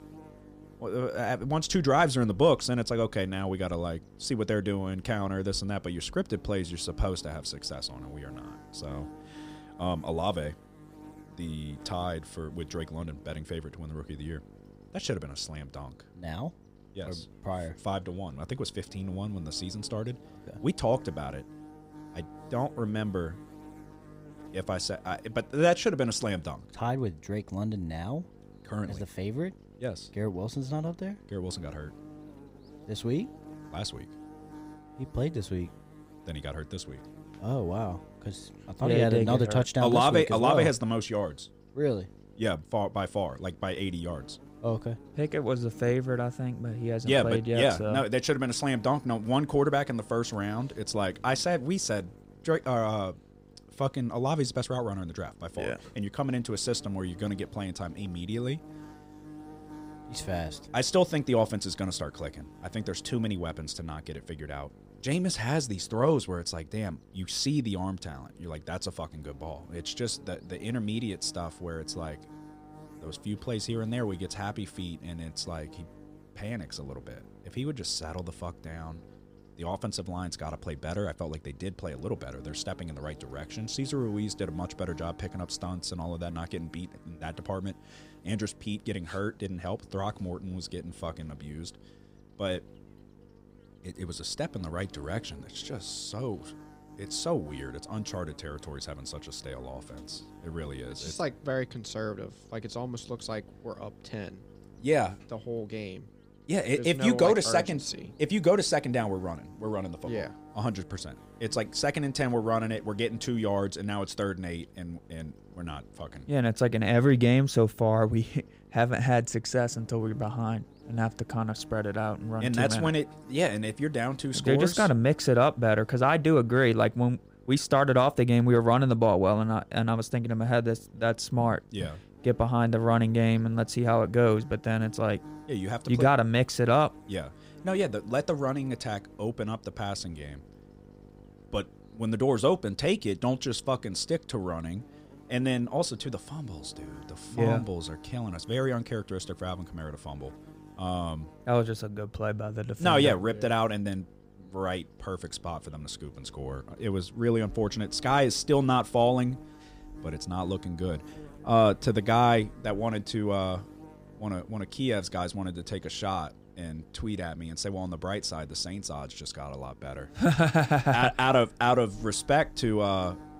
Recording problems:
electrical hum; faint; throughout; 50 Hz, 25 dB below the speech

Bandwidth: 15.5 kHz